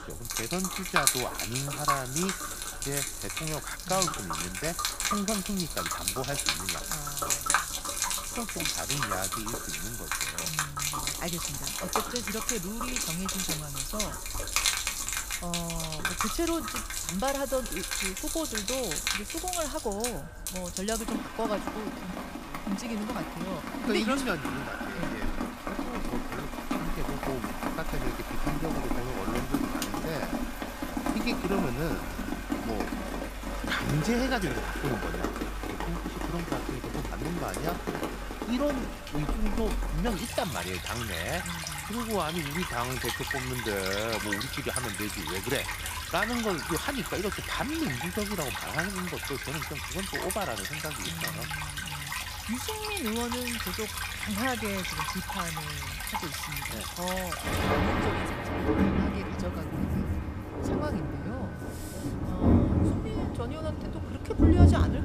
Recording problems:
echo of what is said; noticeable; throughout; 120 ms later, 15 dB below the speech
rain or running water; very loud; throughout; 4 dB above the speech
electrical hum; faint; throughout; 60 Hz, 25 dB below the speech

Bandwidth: 15 kHz